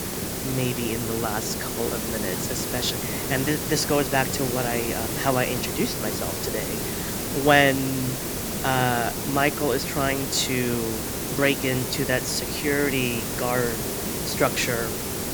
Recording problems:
hiss; loud; throughout; 2 dB below the speech

